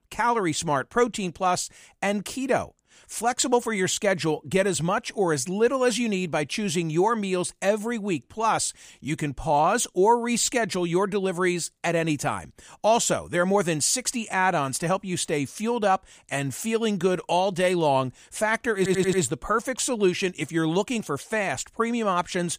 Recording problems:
audio stuttering; at 19 s

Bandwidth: 15 kHz